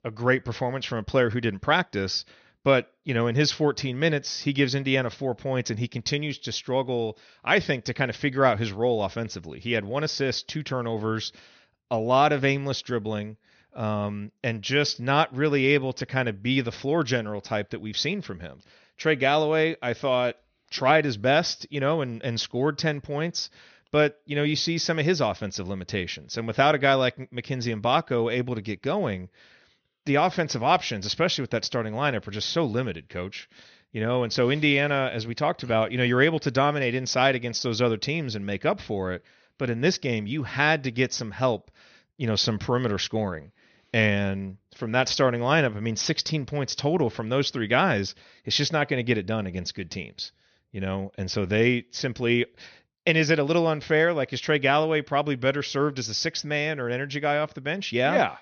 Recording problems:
high frequencies cut off; noticeable; nothing above 6.5 kHz

